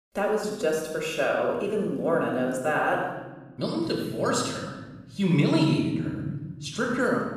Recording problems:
room echo; noticeable; dies away in 2.1 s
off-mic speech; somewhat distant

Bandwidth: 14.5 kHz